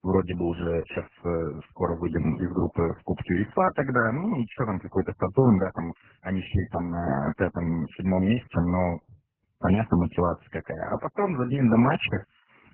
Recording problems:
garbled, watery; badly; nothing above 3 kHz

